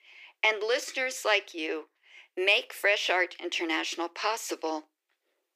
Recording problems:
thin; very; fading below 350 Hz

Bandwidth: 15 kHz